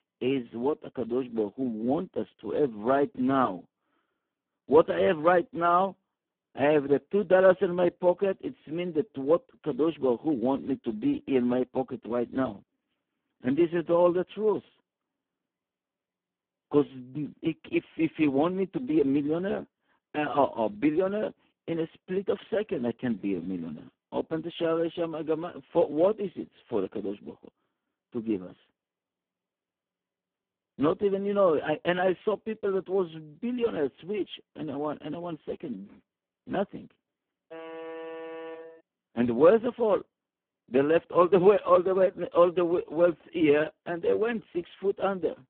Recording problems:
phone-call audio; poor line
alarm; faint; from 38 to 39 s; peak 10 dB below the speech

